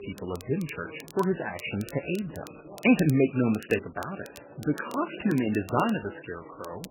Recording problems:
garbled, watery; badly; nothing above 3 kHz
background chatter; faint; throughout; 3 voices, 20 dB below the speech
crackle, like an old record; faint; 25 dB below the speech

